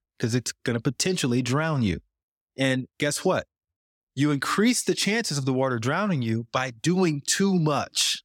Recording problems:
none

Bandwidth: 17 kHz